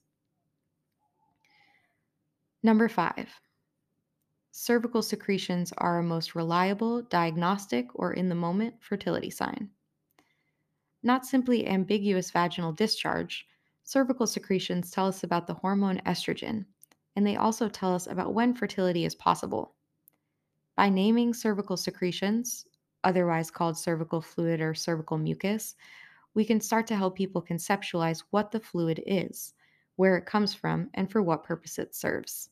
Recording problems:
none

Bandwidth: 14.5 kHz